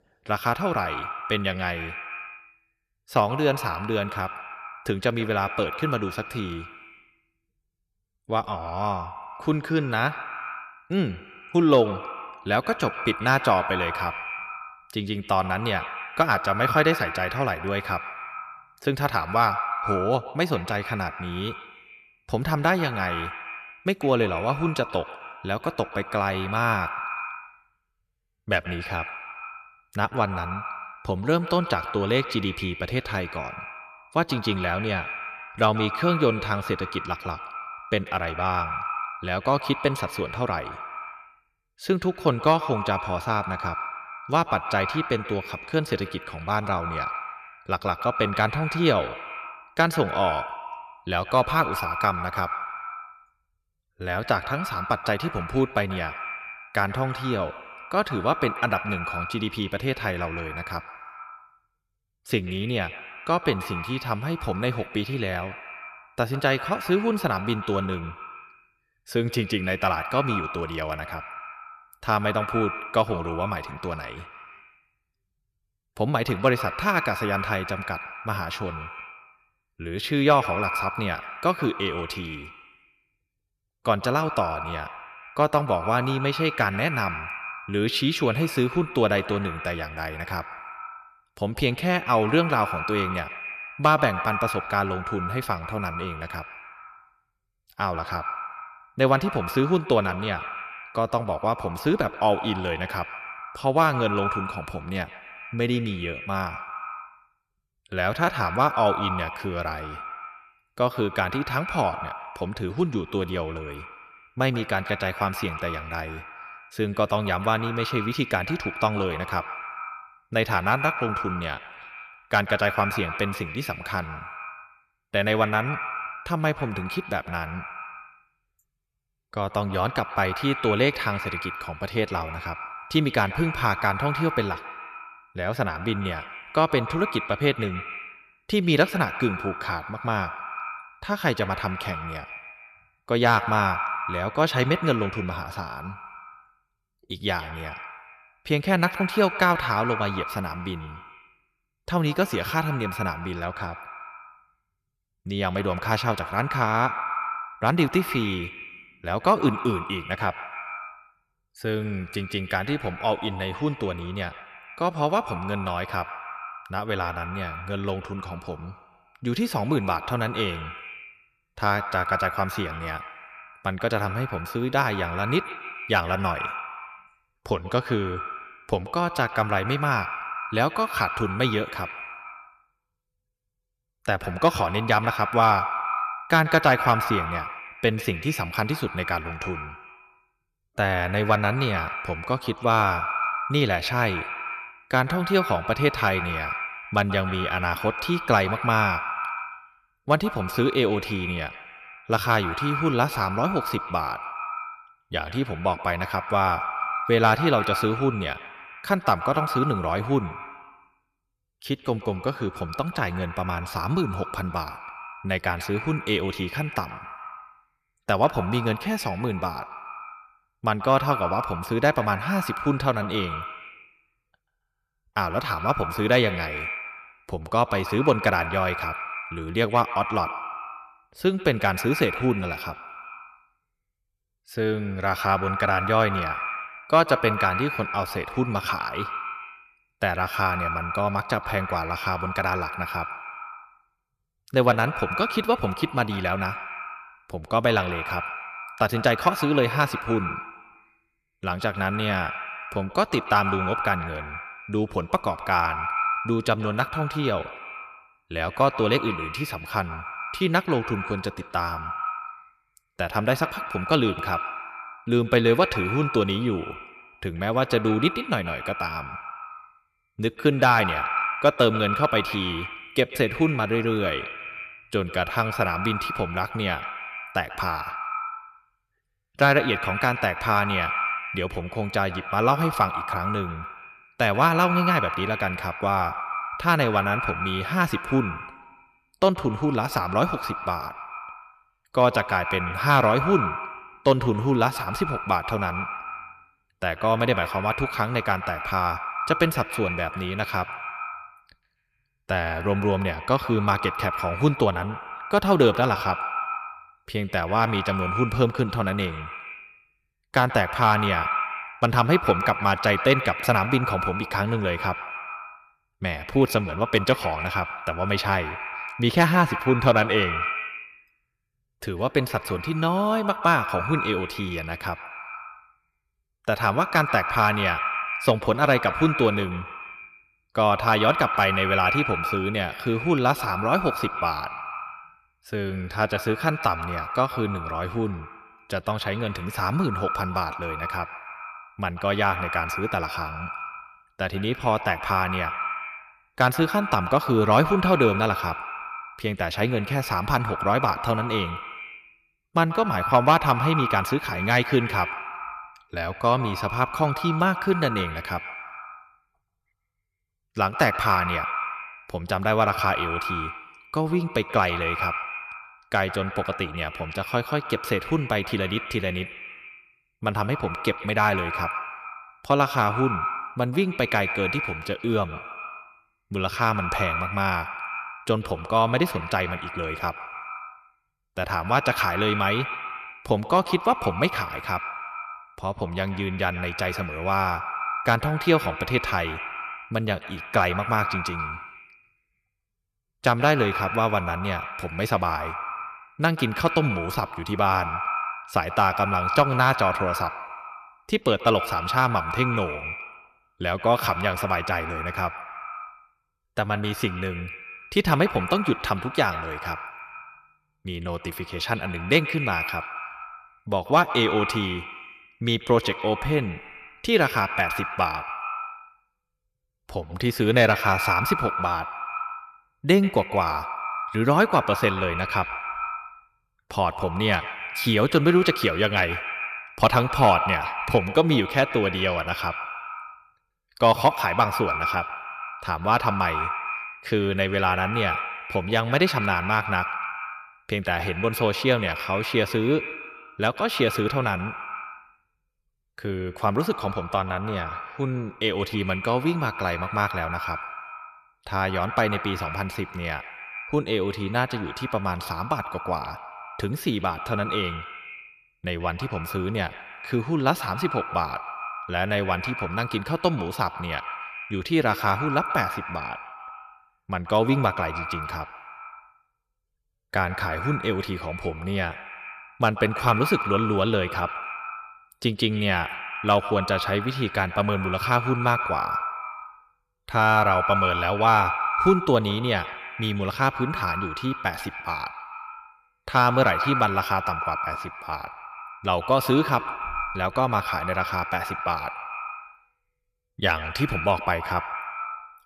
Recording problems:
echo of what is said; strong; throughout; 130 ms later, 7 dB below the speech

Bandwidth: 14.5 kHz